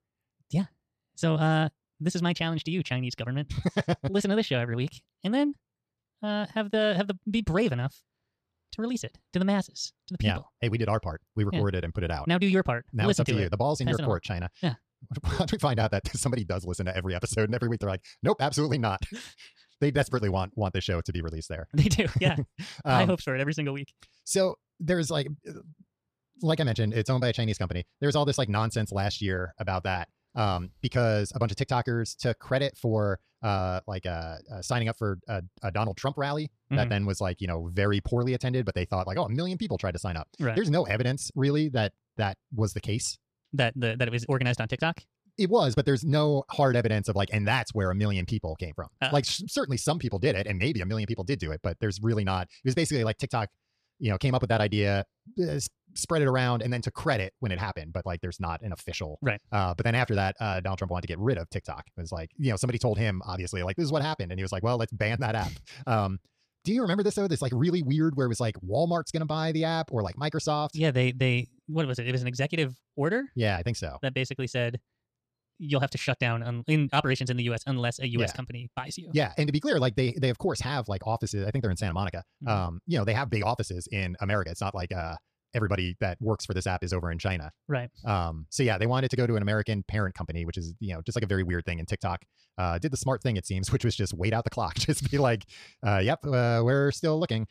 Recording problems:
wrong speed, natural pitch; too fast; 1.7 times normal speed

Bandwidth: 14.5 kHz